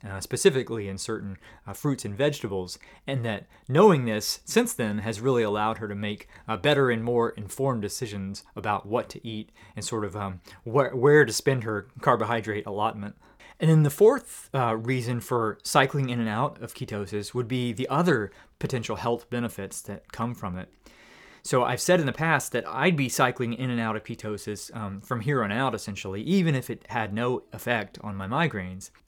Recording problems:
none

